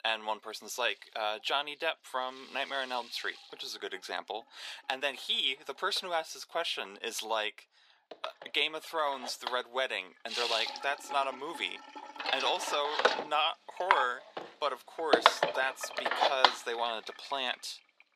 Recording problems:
thin; very; fading below 500 Hz
household noises; very loud; throughout; 2 dB above the speech

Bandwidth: 14.5 kHz